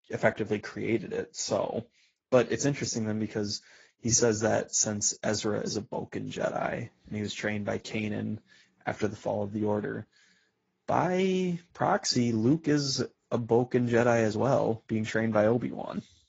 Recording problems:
garbled, watery; badly; nothing above 7 kHz

